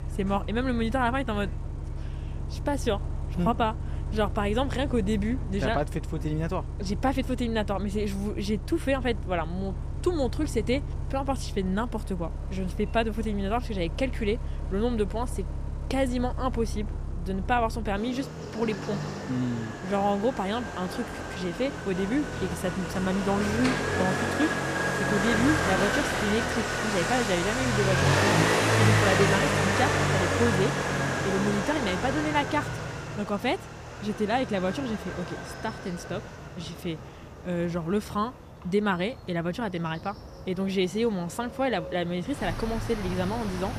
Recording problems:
traffic noise; loud; throughout; 1 dB below the speech

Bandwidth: 14.5 kHz